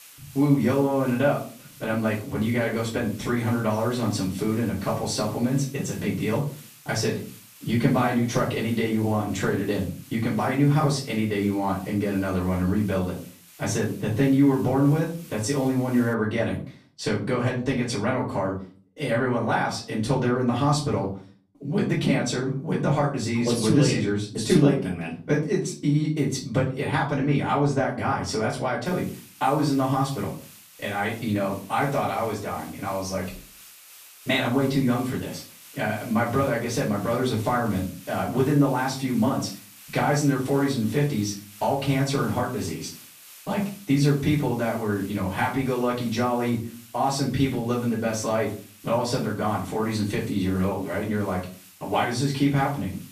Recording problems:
off-mic speech; far
room echo; slight; dies away in 0.3 s
hiss; faint; until 16 s and from 29 s on; 20 dB below the speech

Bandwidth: 14.5 kHz